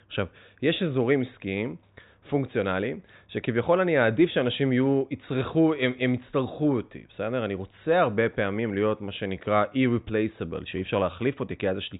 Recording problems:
high frequencies cut off; severe; nothing above 4 kHz

